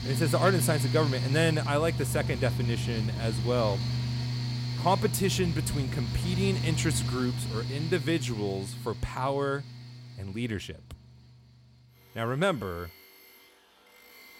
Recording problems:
machinery noise; loud; throughout; 2 dB below the speech

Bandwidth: 16 kHz